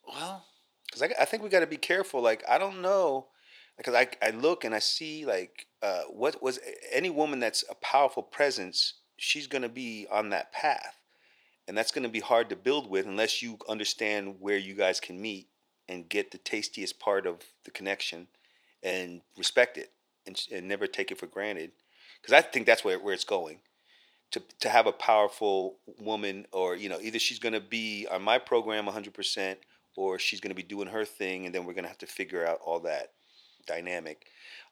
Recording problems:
thin; somewhat; fading below 450 Hz

